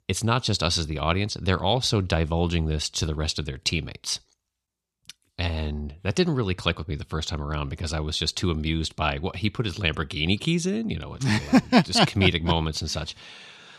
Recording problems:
none

